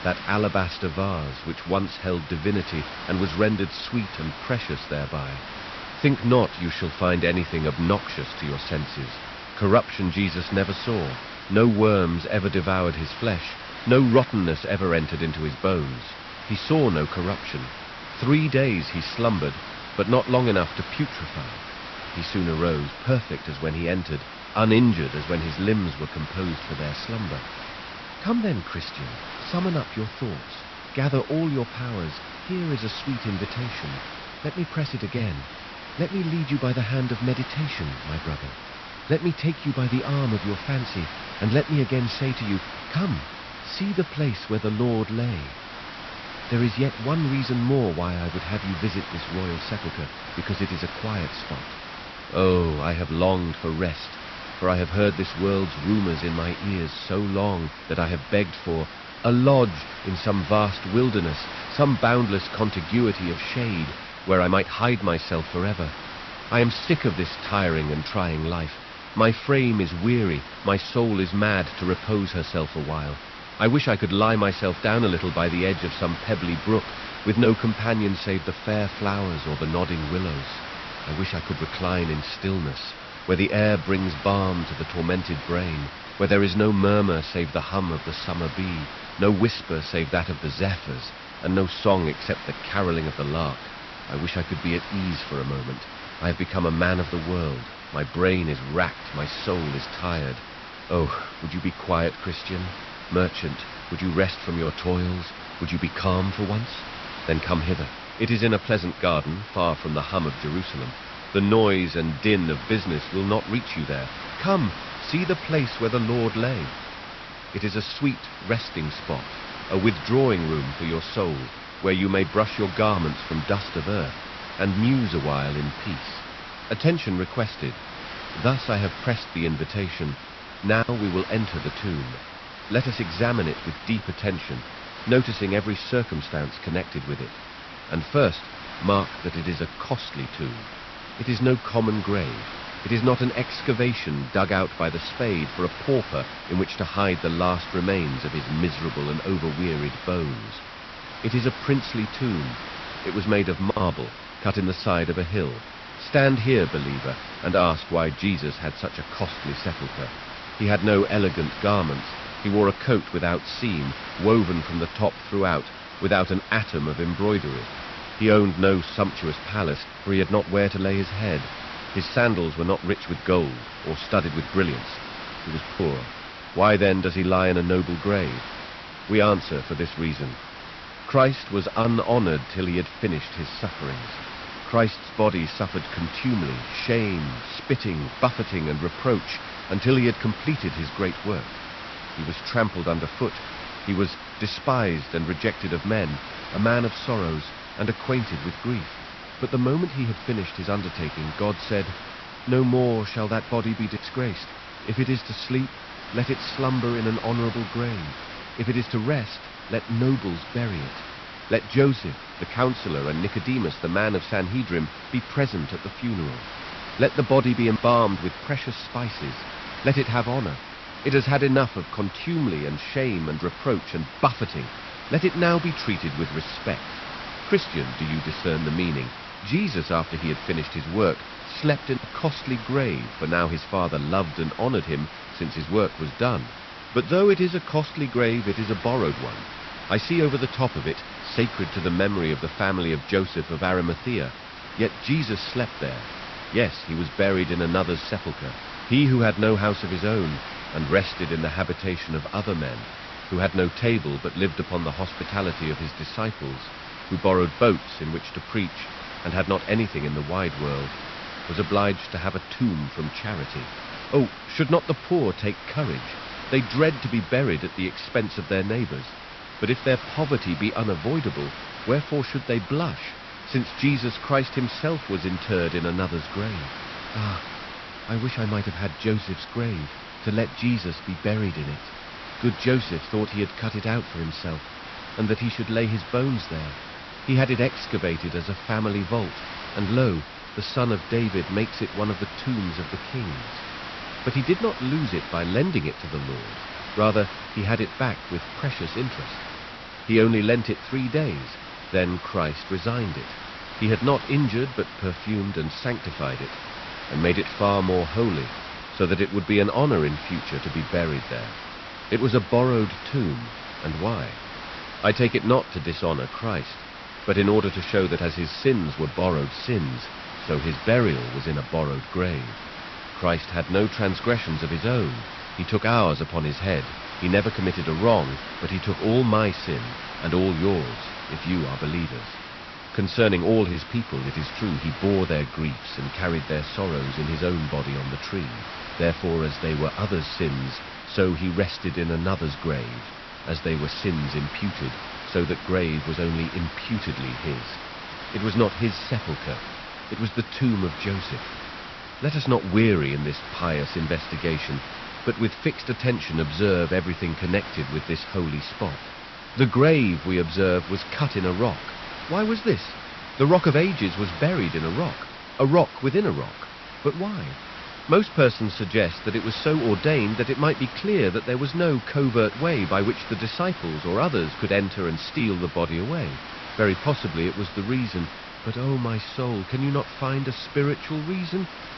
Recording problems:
high frequencies cut off; noticeable; nothing above 5.5 kHz
hiss; noticeable; throughout; 10 dB below the speech

